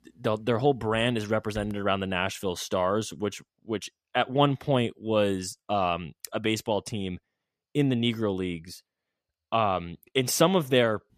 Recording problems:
none

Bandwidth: 14.5 kHz